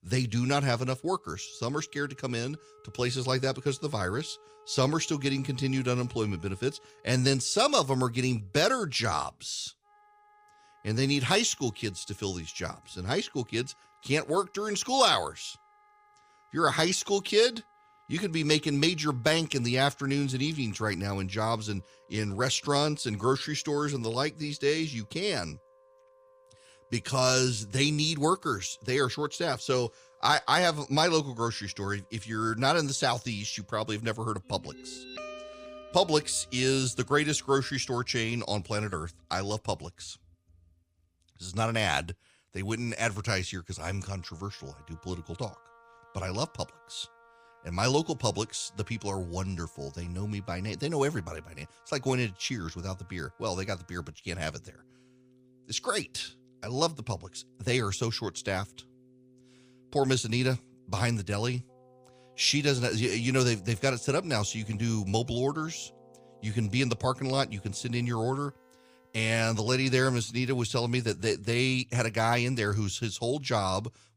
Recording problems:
background music; faint; throughout; 25 dB below the speech

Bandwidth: 15 kHz